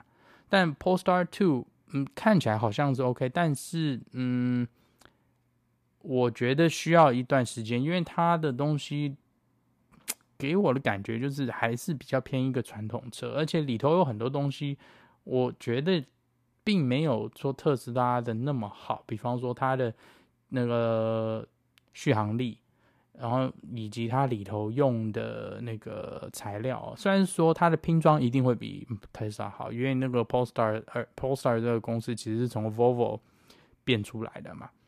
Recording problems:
none

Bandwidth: 14.5 kHz